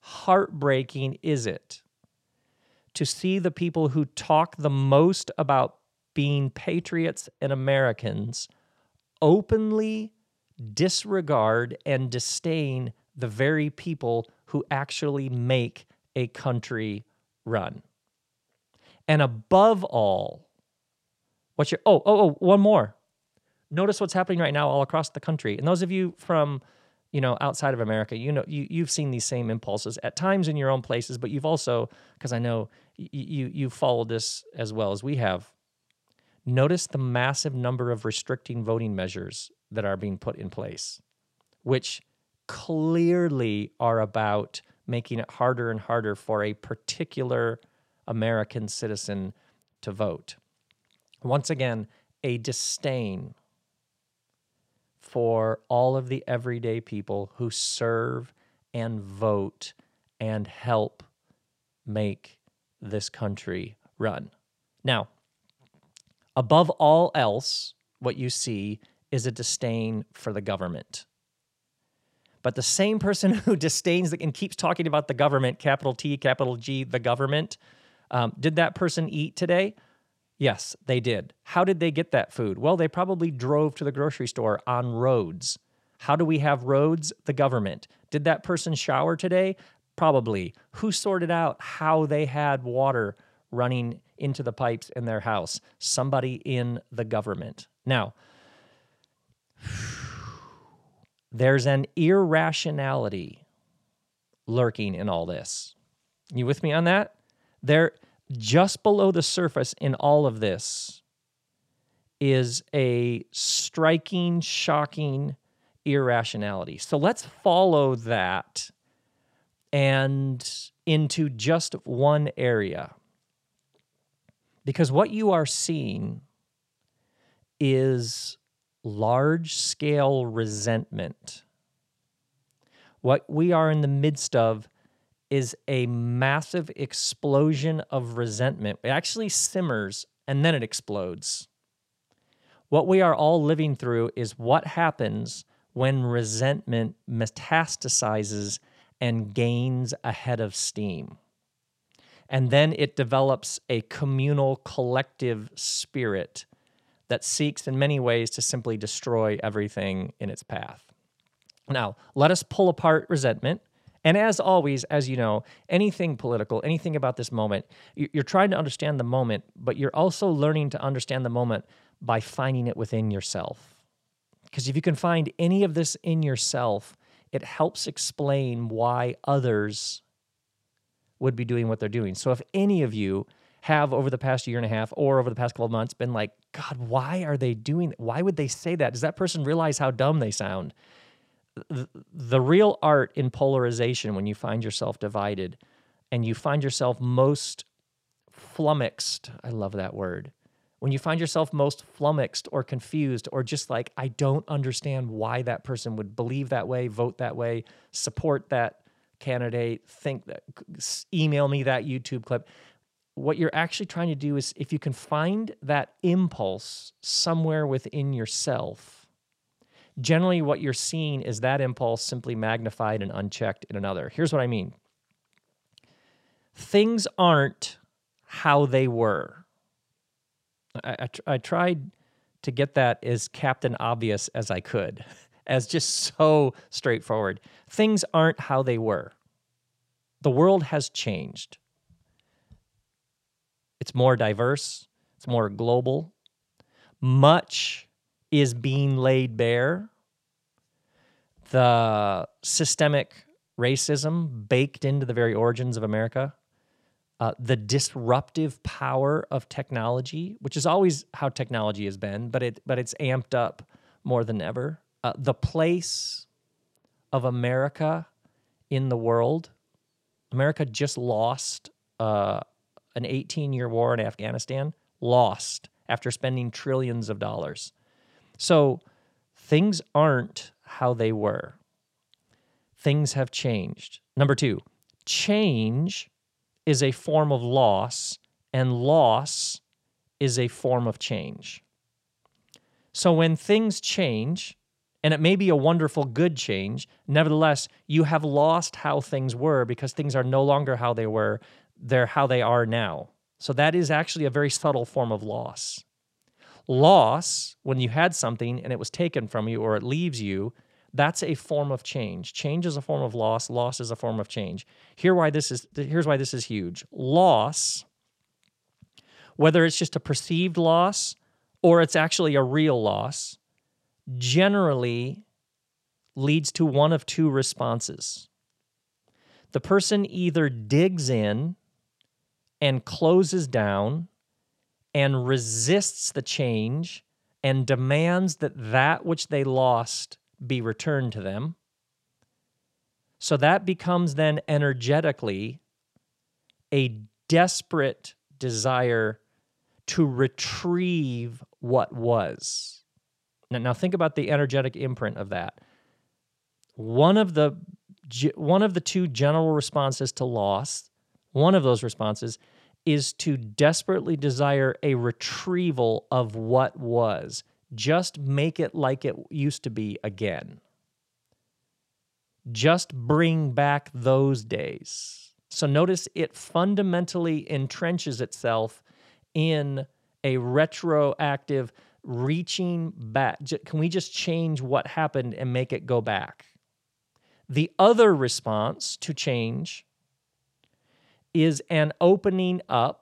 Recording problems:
none

